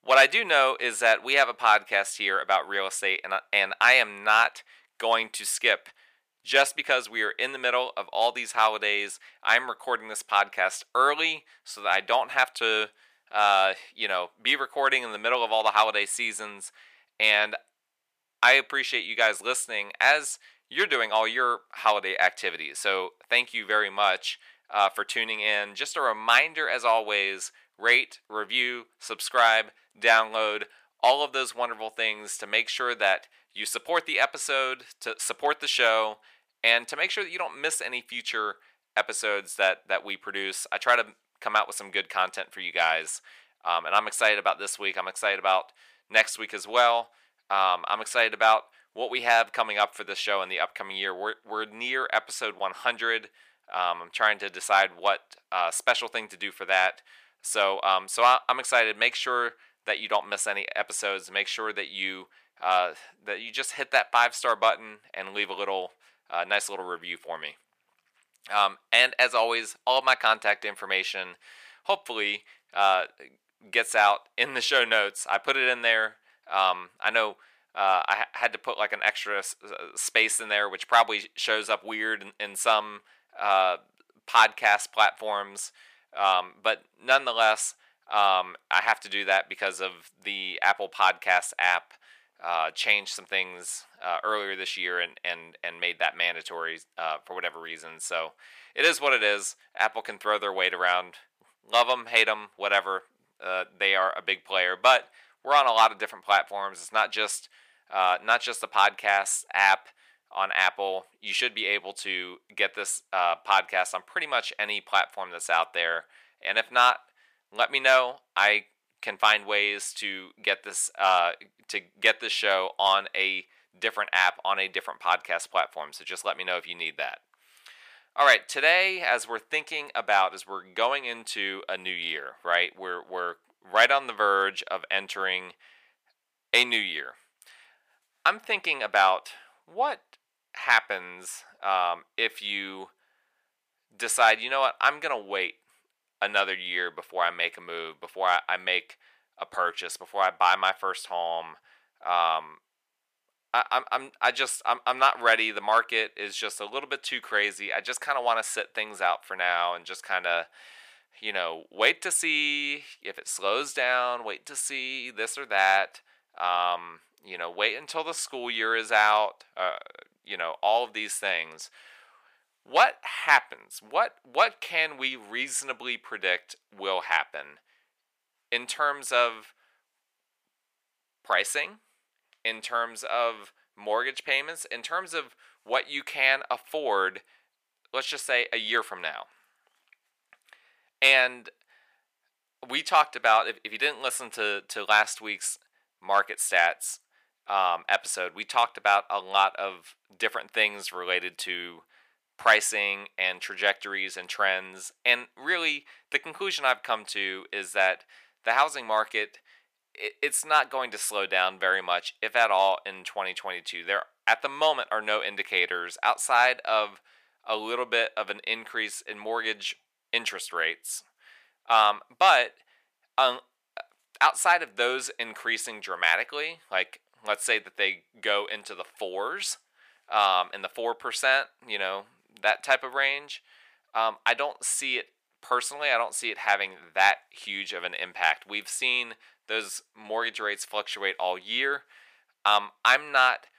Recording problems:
thin; very; fading below 750 Hz

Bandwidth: 15 kHz